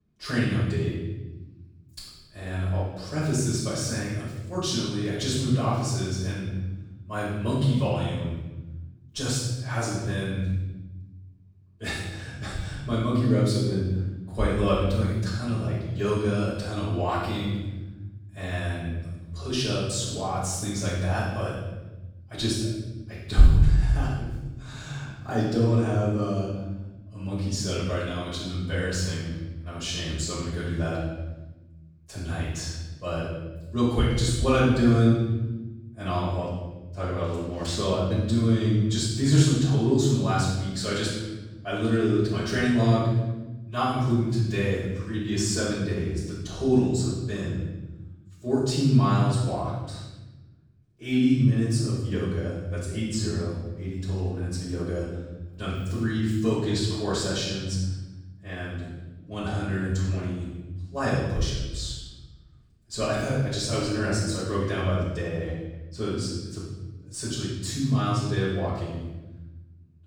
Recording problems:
room echo; strong; dies away in 1.2 s
off-mic speech; far

